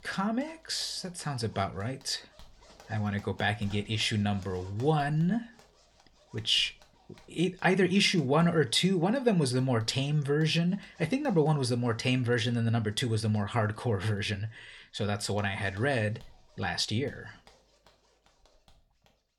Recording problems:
household noises; faint; throughout; 30 dB below the speech

